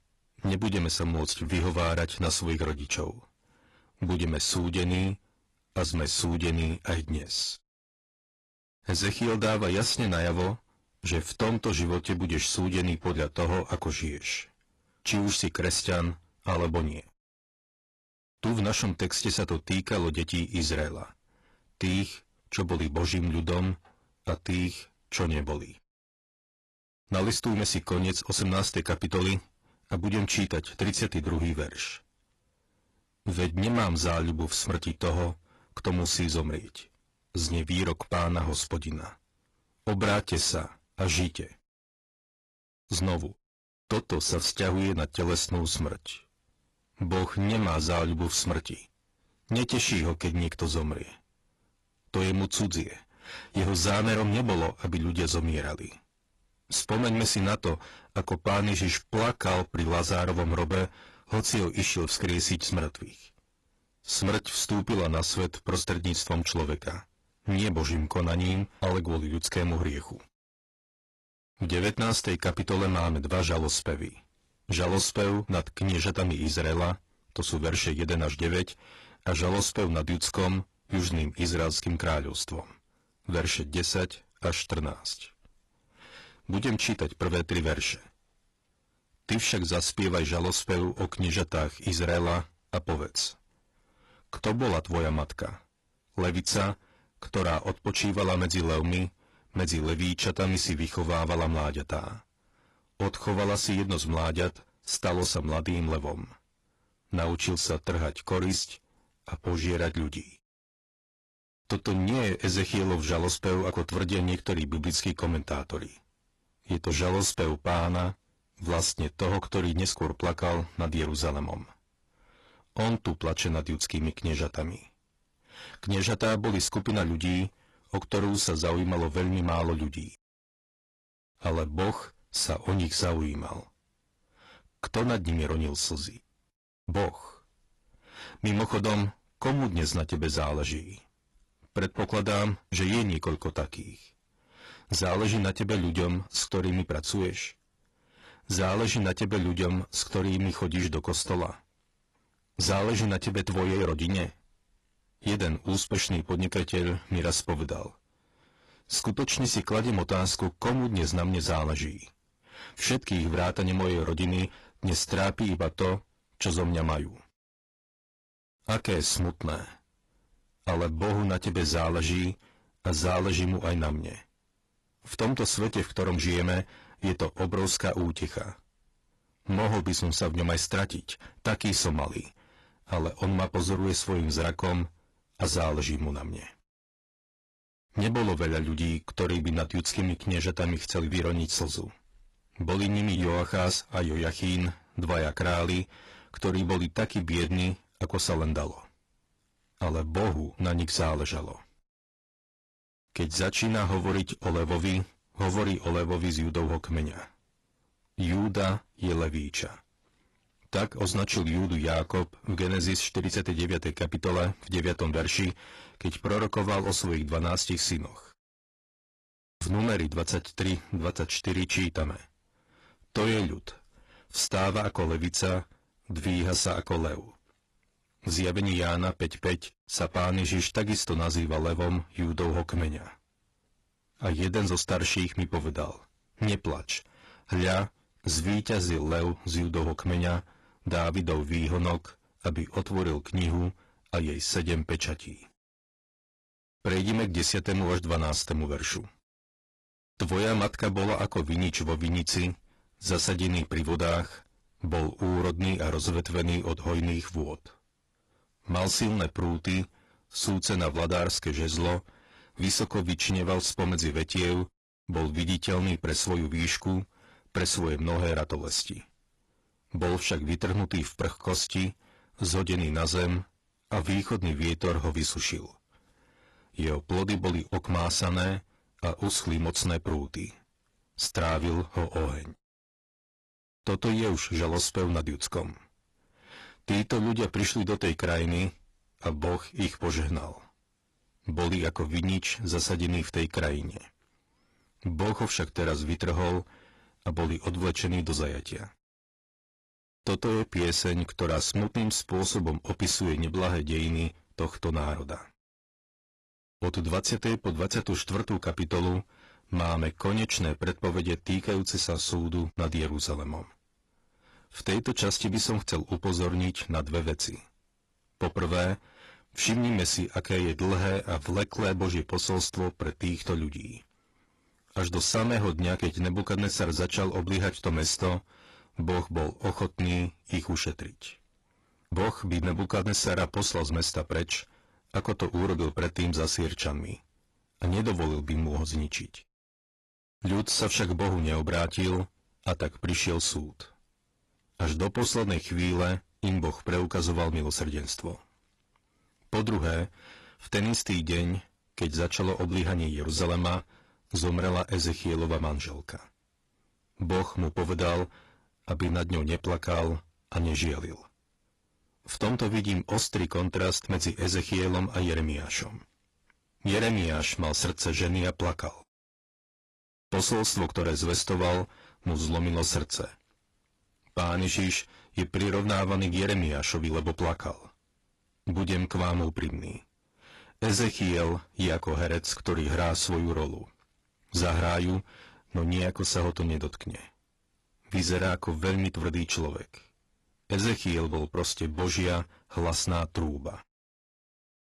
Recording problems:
distortion; heavy; 13% of the sound clipped
garbled, watery; slightly; nothing above 11 kHz

